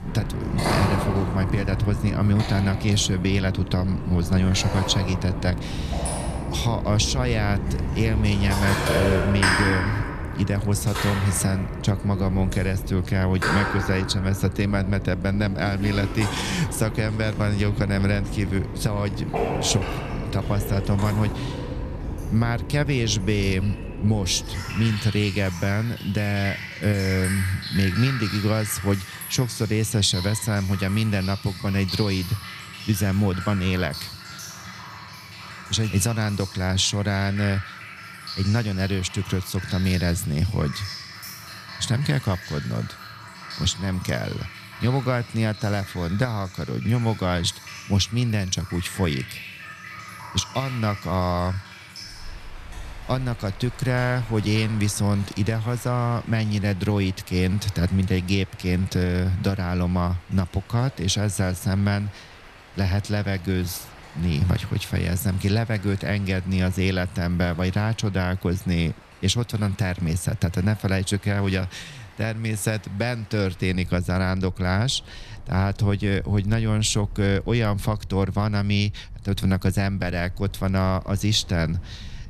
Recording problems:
rain or running water; loud; throughout; 8 dB below the speech

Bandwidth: 14 kHz